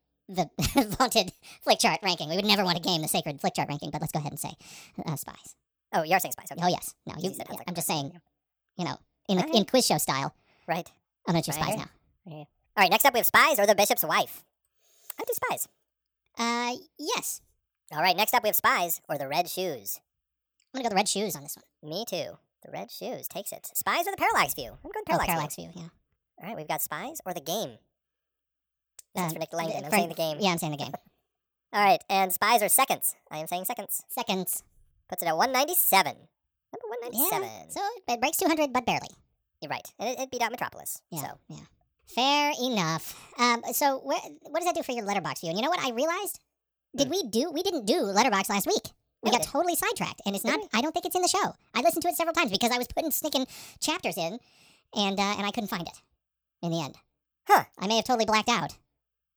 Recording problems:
wrong speed and pitch; too fast and too high; 1.5 times normal speed

